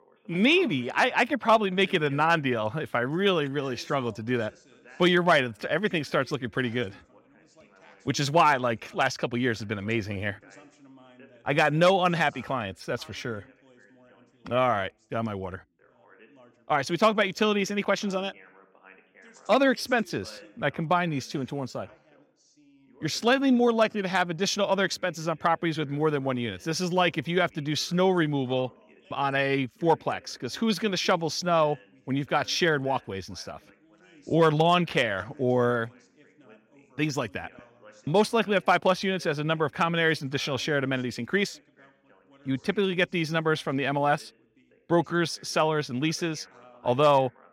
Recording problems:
background chatter; faint; throughout; 2 voices, 30 dB below the speech

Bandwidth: 16 kHz